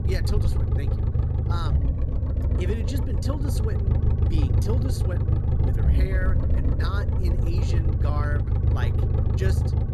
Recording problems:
low rumble; loud; throughout; as loud as the speech

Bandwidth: 15.5 kHz